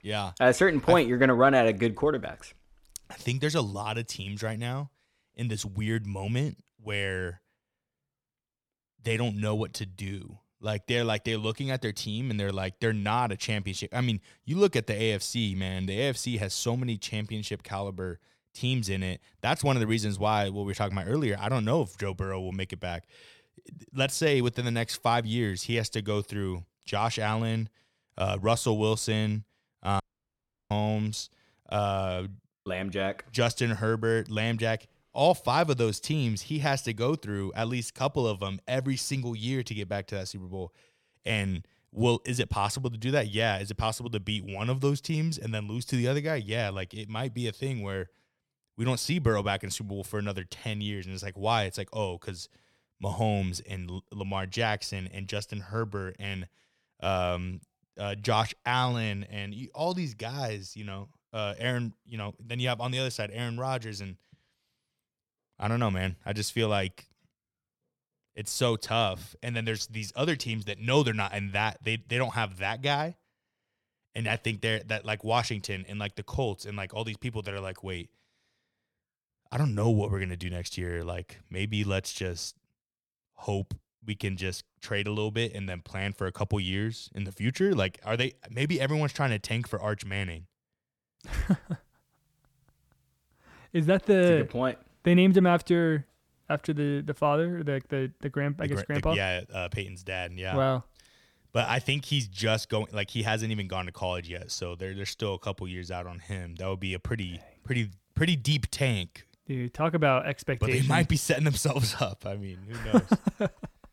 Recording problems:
audio cutting out; at 30 s for 0.5 s

